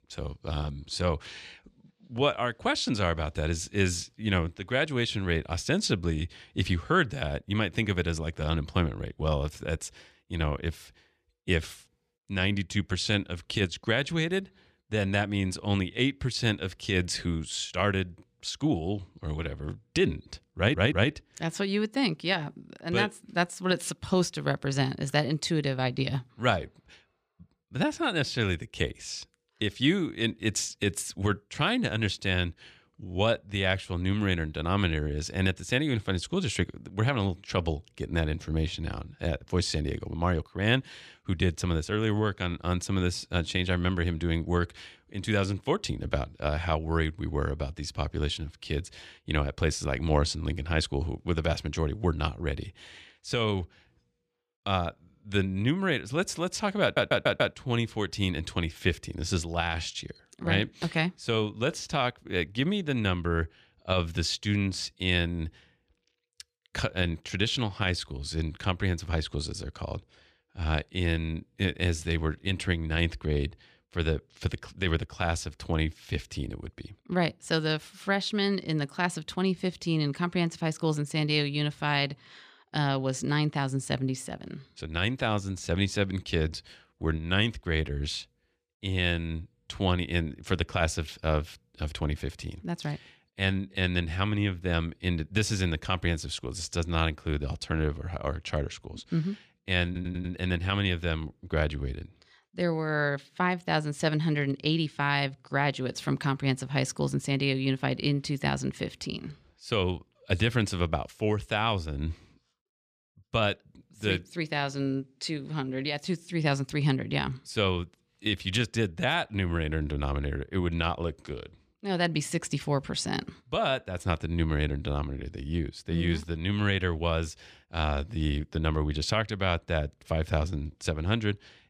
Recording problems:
audio stuttering; at 21 s, at 57 s and at 1:40

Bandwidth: 14.5 kHz